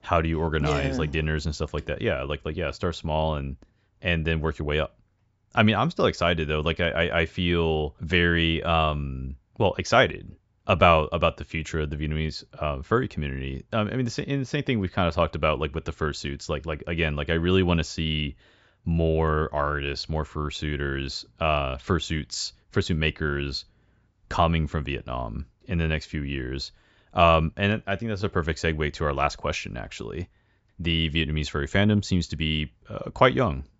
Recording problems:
high frequencies cut off; noticeable; nothing above 8 kHz

